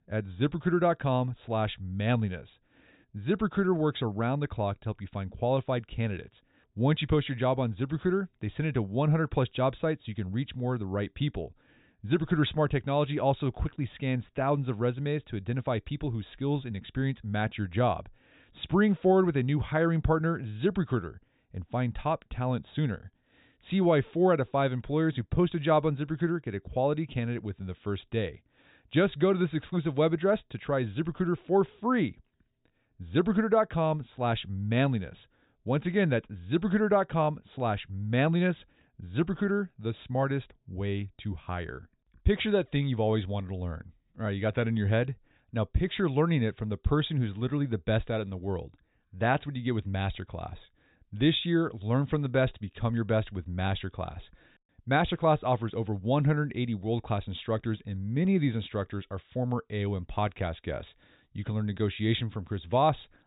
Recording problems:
high frequencies cut off; severe; nothing above 4 kHz

